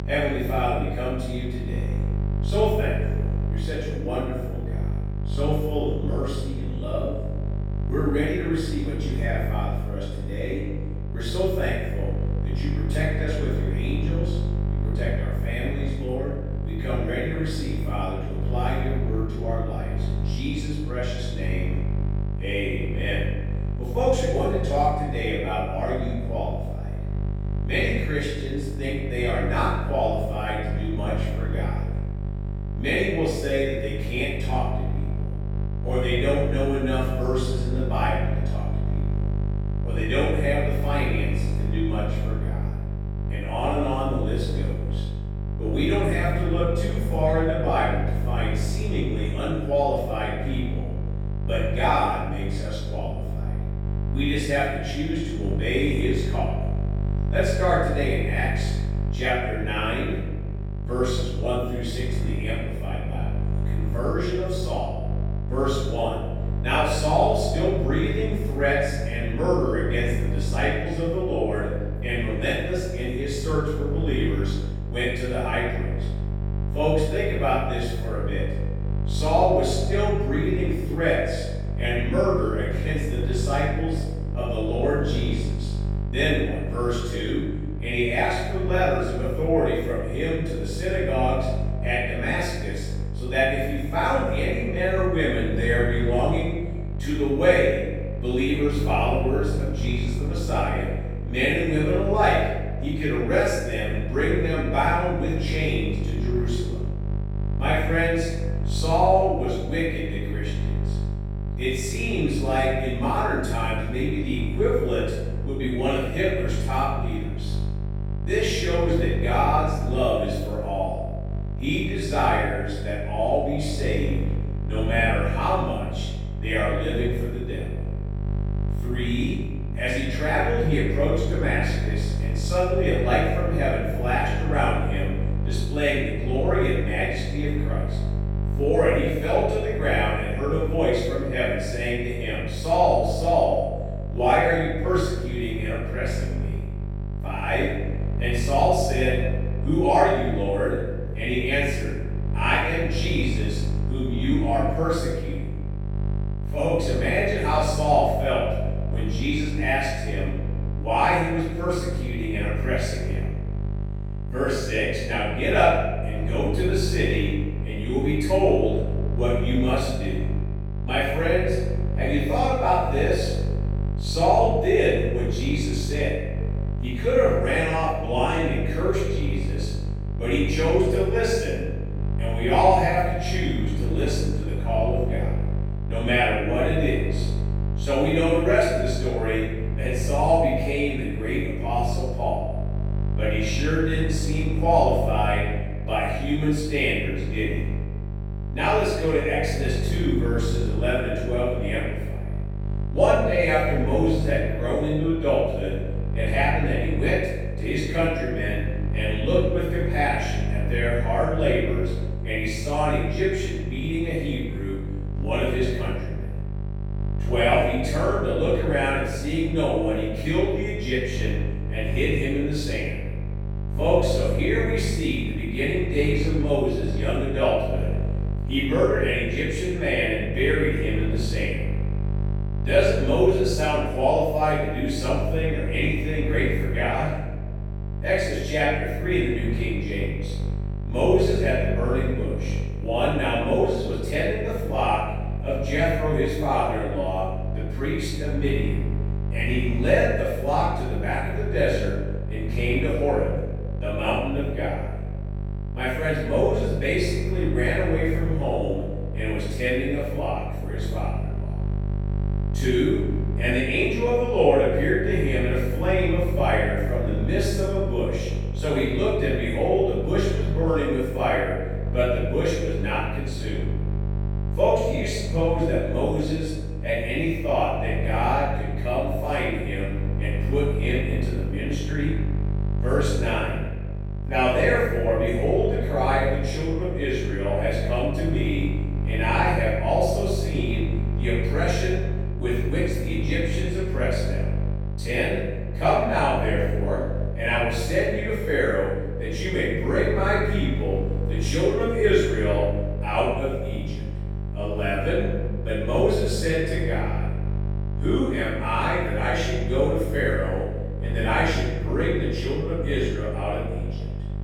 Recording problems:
room echo; strong; dies away in 1.1 s
off-mic speech; far
electrical hum; noticeable; throughout; 50 Hz, 15 dB below the speech

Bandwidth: 17.5 kHz